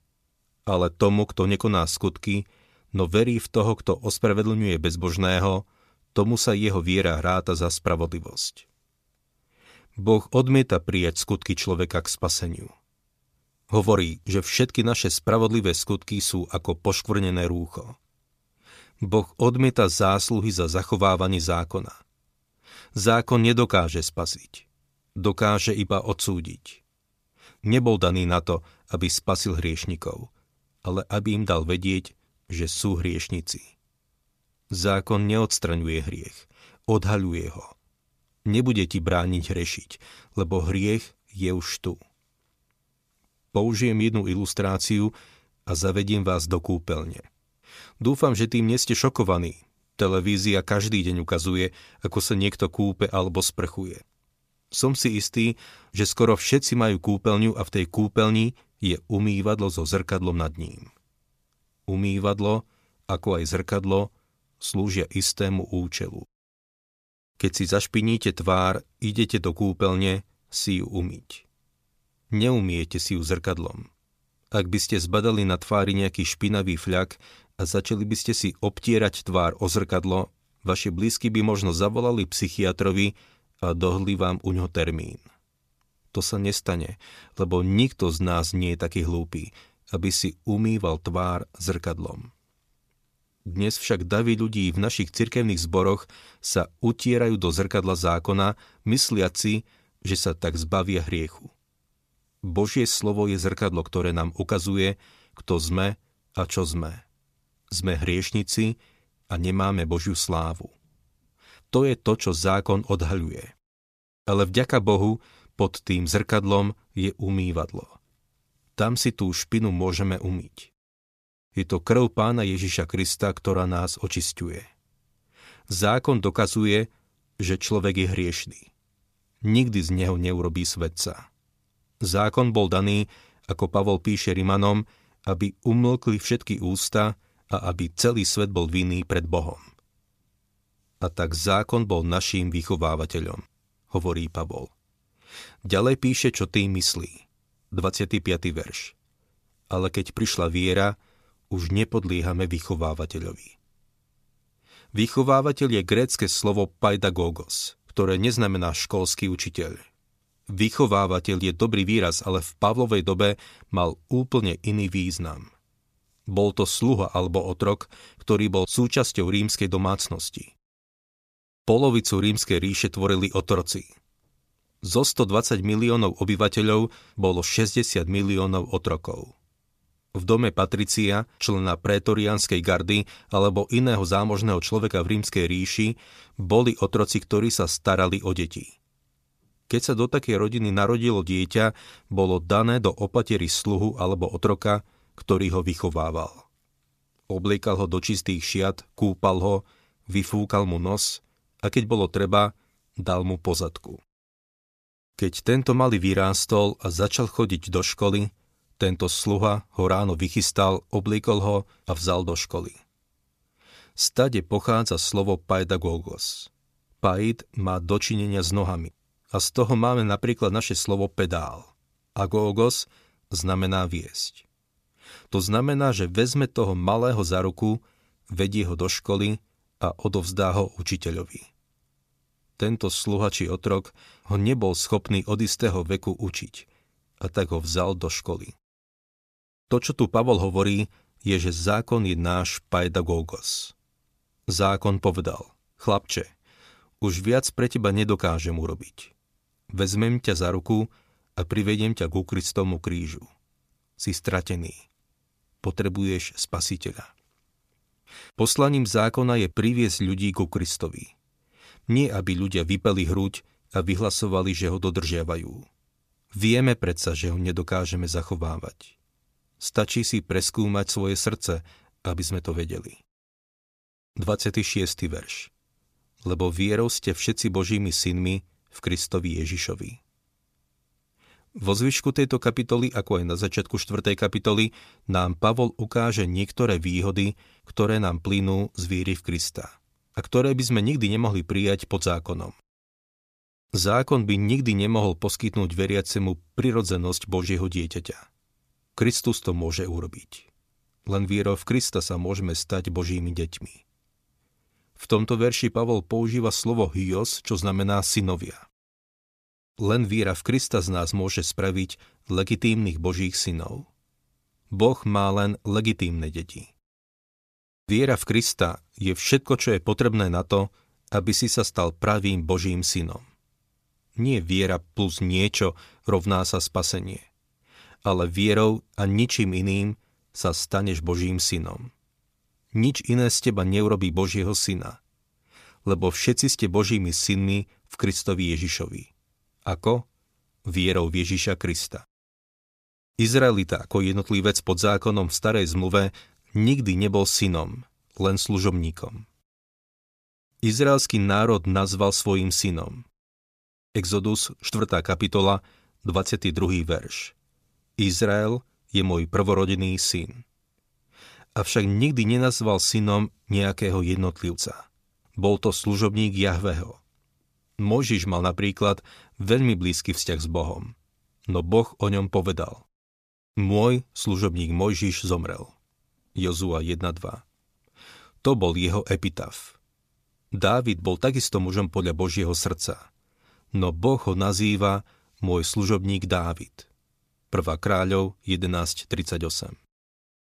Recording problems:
none

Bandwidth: 14.5 kHz